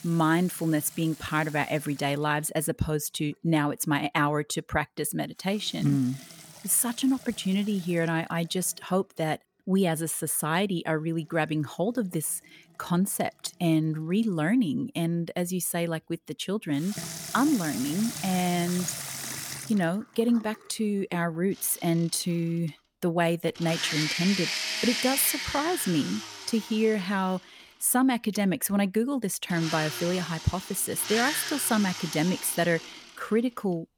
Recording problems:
household noises; loud; throughout; 7 dB below the speech

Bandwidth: 18.5 kHz